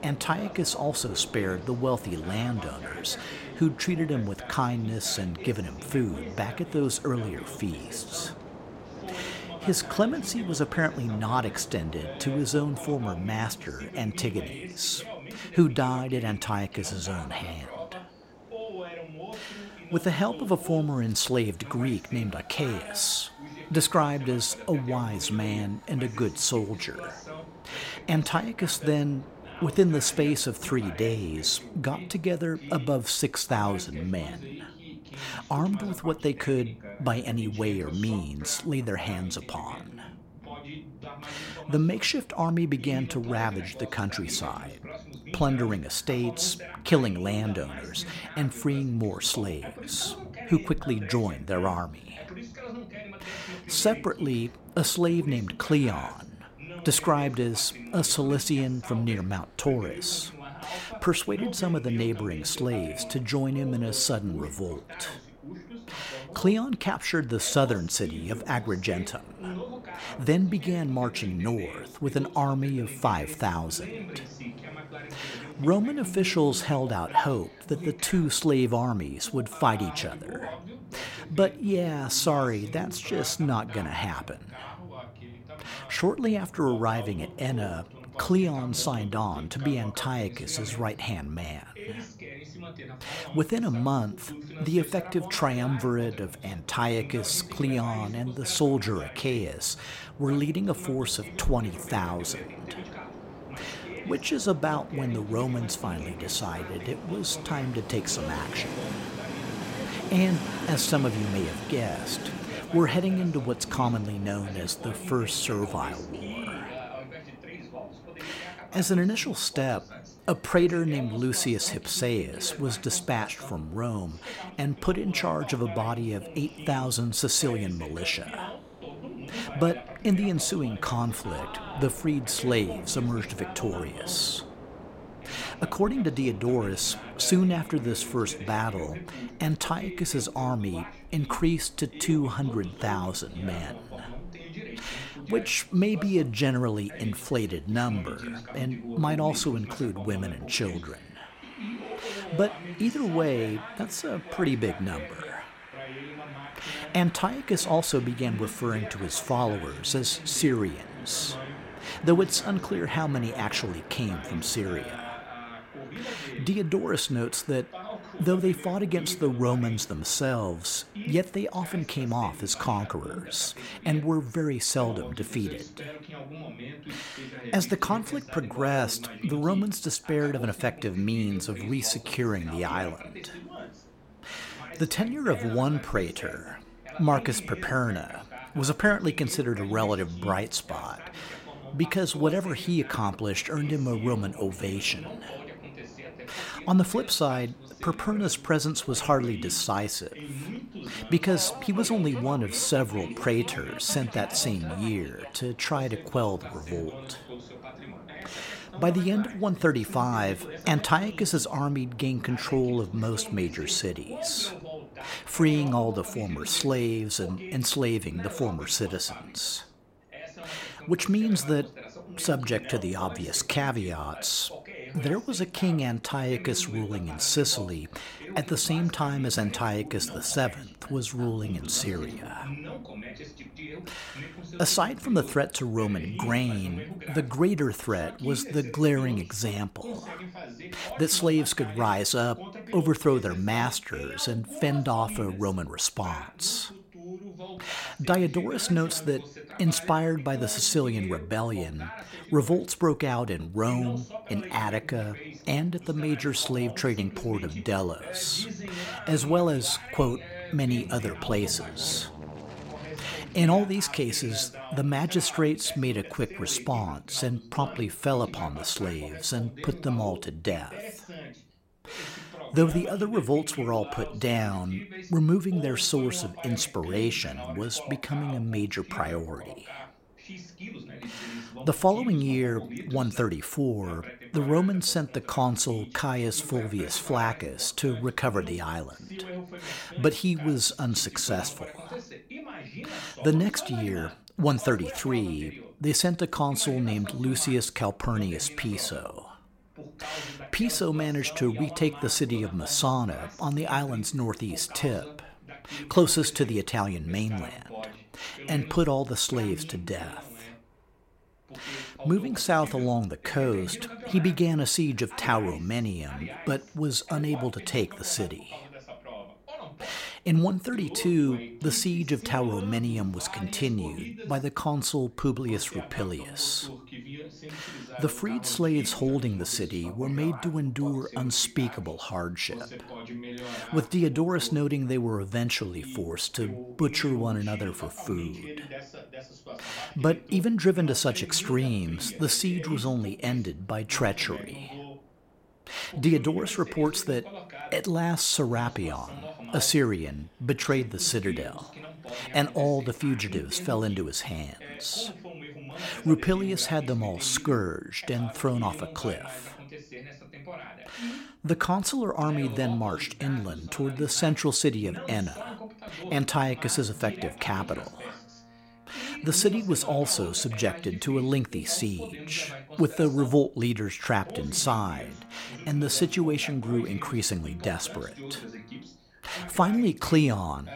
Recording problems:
train or aircraft noise; noticeable; throughout; 20 dB below the speech
voice in the background; noticeable; throughout; 15 dB below the speech

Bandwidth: 16.5 kHz